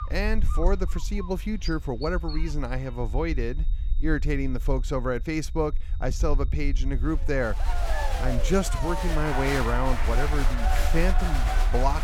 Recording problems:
crowd noise; loud; from 7.5 s on; 4 dB below the speech
animal sounds; noticeable; until 2.5 s; 15 dB below the speech
high-pitched whine; faint; until 7 s; 3.5 kHz, 30 dB below the speech
low rumble; faint; throughout; 20 dB below the speech

